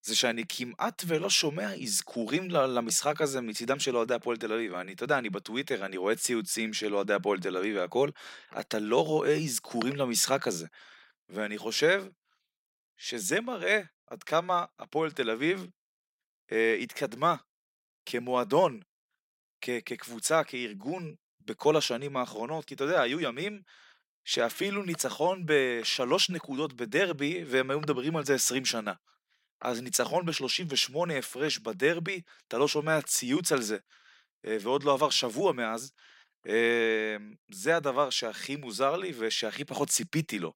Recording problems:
none

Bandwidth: 16 kHz